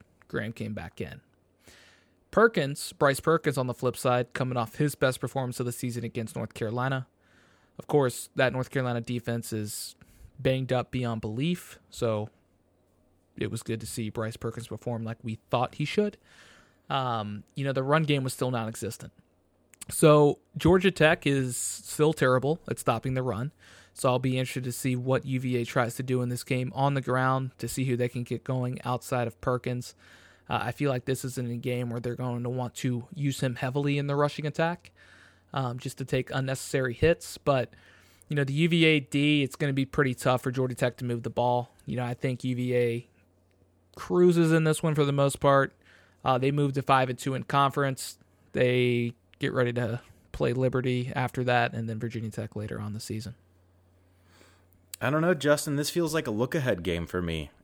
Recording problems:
none

